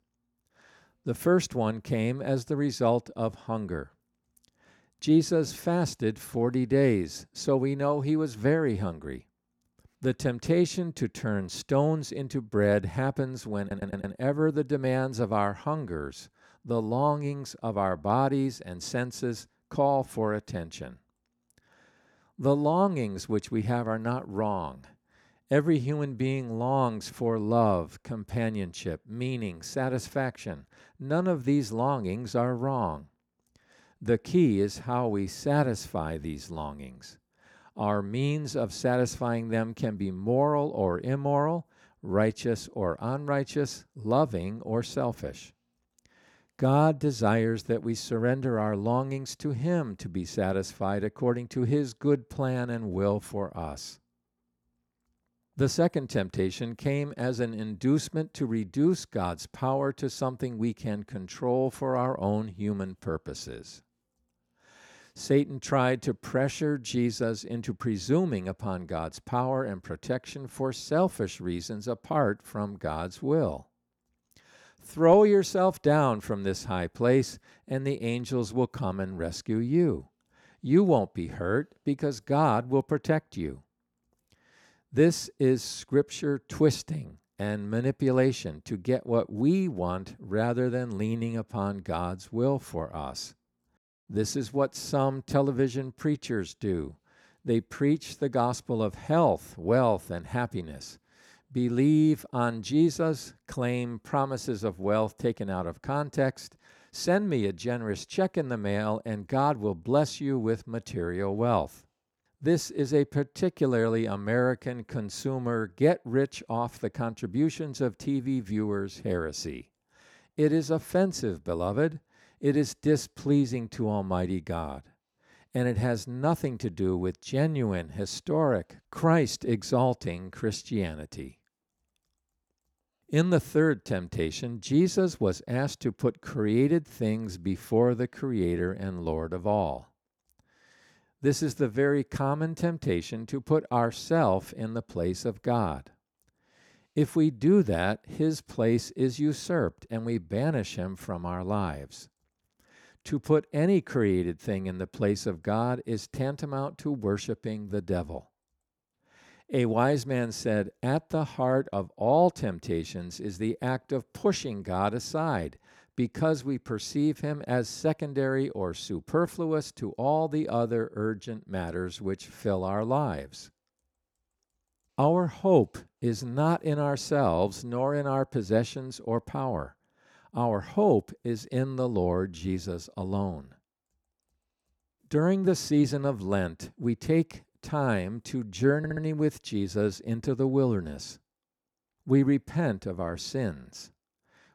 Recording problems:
audio stuttering; at 14 s and at 3:09

